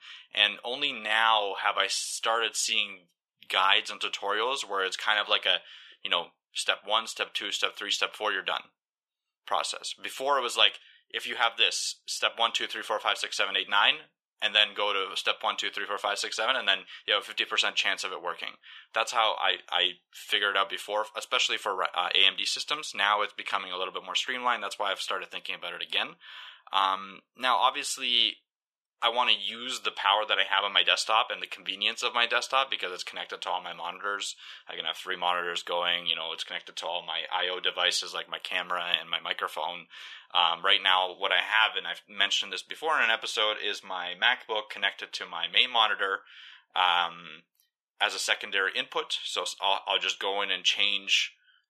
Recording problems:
thin; very; fading below 750 Hz

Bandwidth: 14.5 kHz